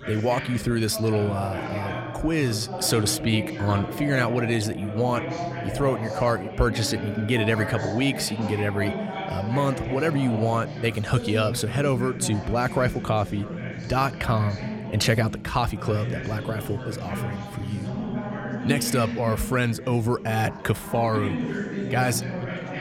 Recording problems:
background chatter; loud; throughout; 3 voices, 7 dB below the speech

